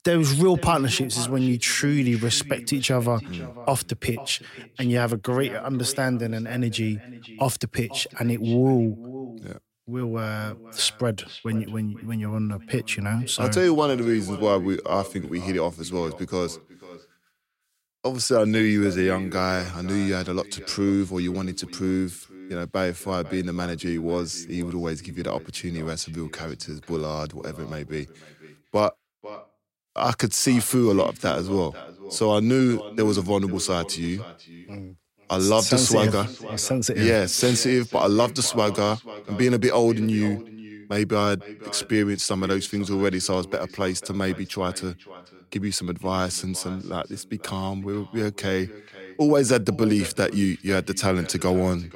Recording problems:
echo of what is said; noticeable; throughout; 490 ms later, 20 dB below the speech

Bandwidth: 16 kHz